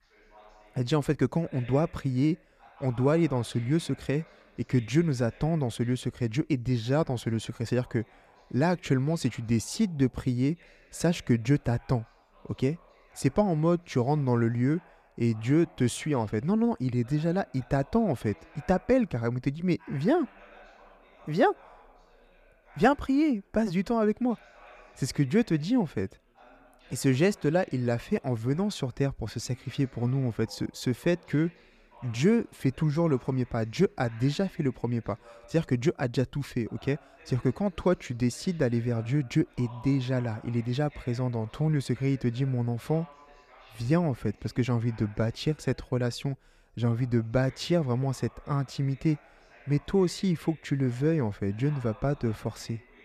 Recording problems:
background chatter; faint; throughout; 3 voices, 25 dB below the speech

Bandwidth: 14.5 kHz